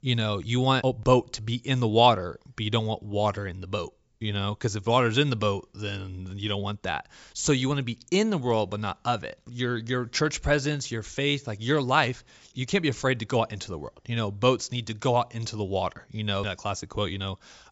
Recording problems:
high frequencies cut off; noticeable; nothing above 8 kHz

